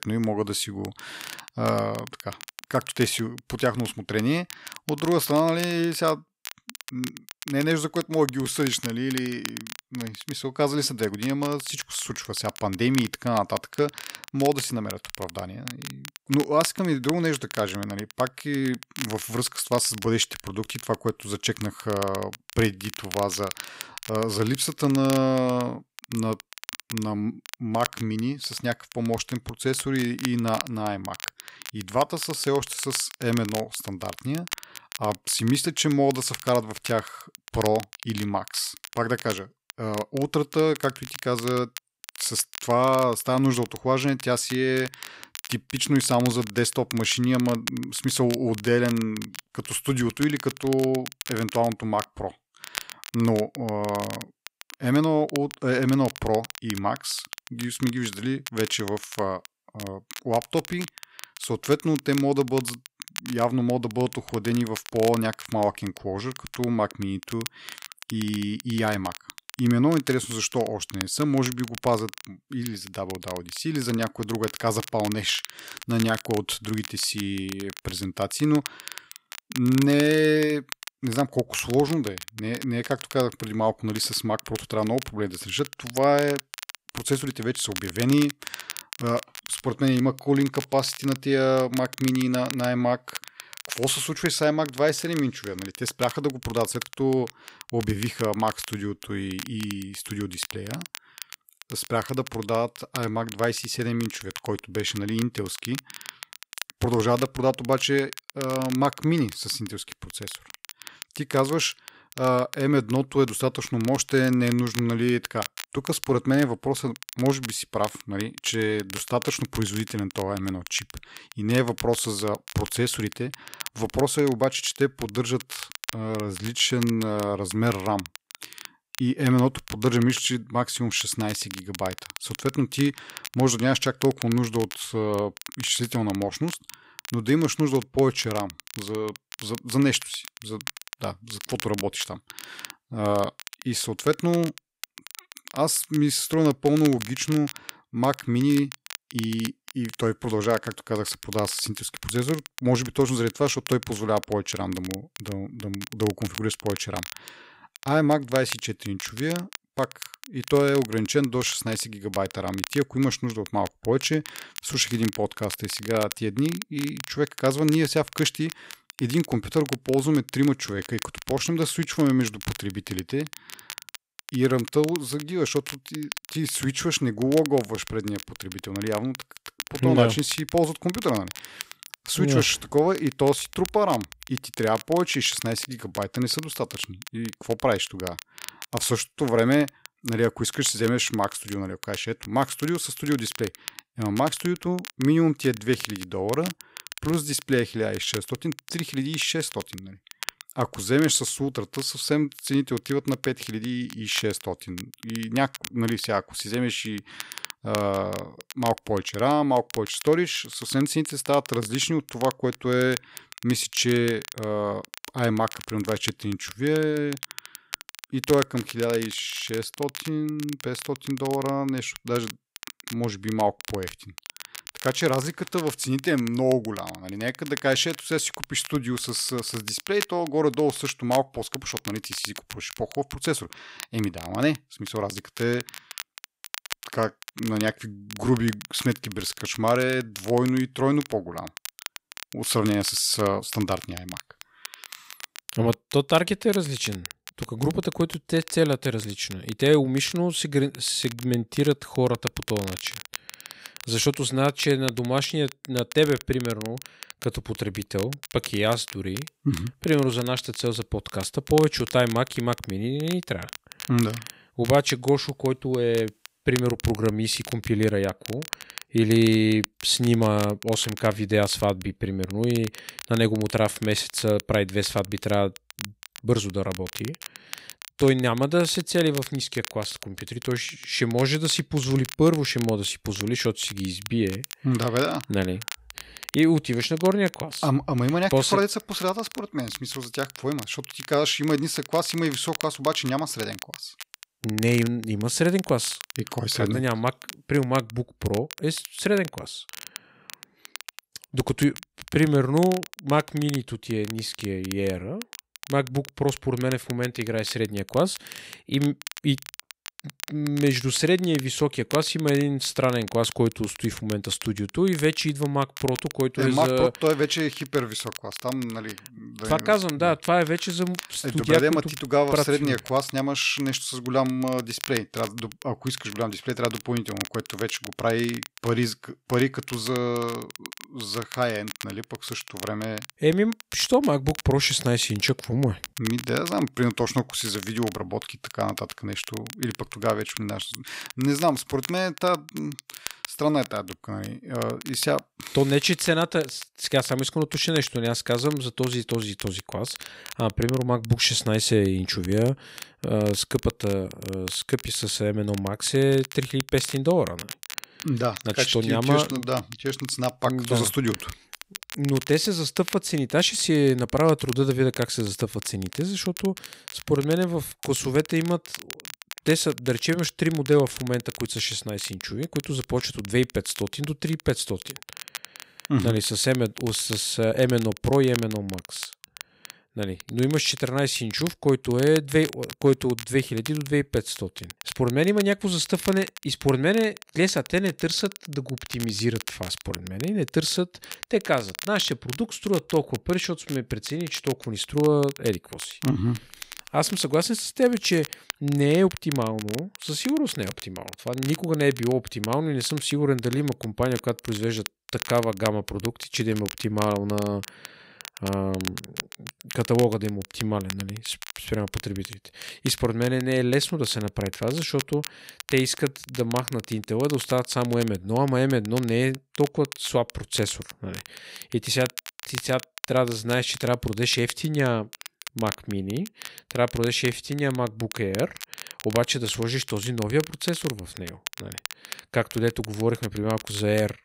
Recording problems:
crackle, like an old record; noticeable; 15 dB below the speech

